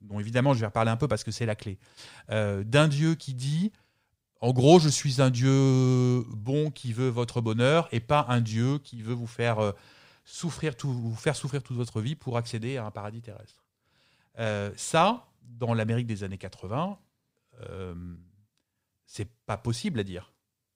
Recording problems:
none

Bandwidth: 15.5 kHz